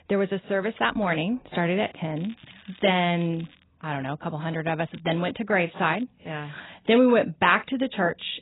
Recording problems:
garbled, watery; badly; nothing above 4 kHz
crackling; very faint; from 2 to 3.5 s, at 5 s and at 6 s; 25 dB below the speech

